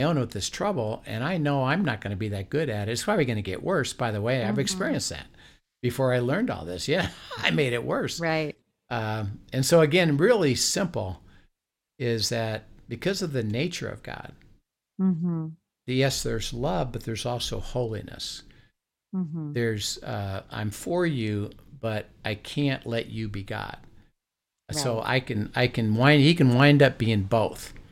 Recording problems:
abrupt cut into speech; at the start

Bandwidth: 16 kHz